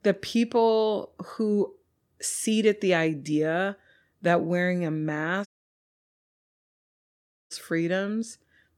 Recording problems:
audio cutting out; at 5.5 s for 2 s

